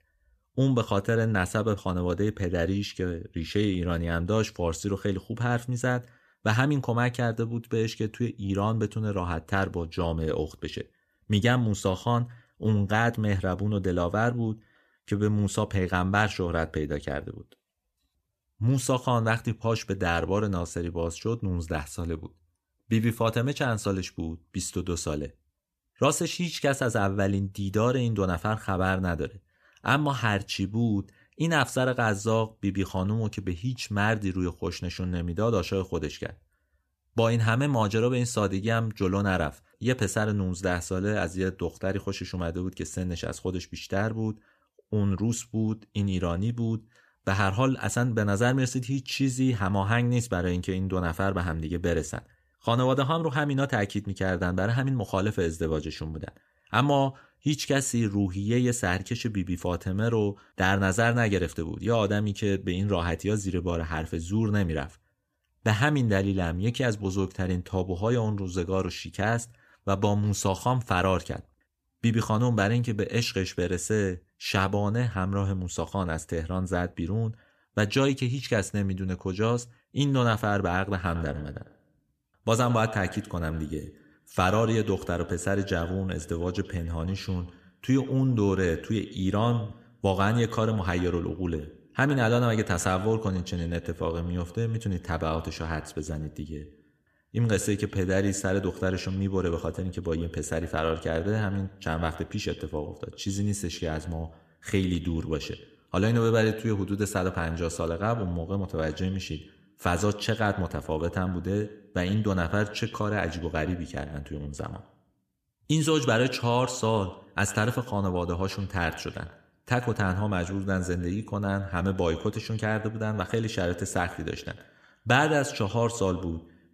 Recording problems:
echo of what is said; noticeable; from 1:21 on; 100 ms later, 15 dB below the speech

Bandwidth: 14.5 kHz